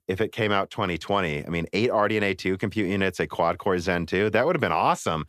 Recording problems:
none

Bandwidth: 14.5 kHz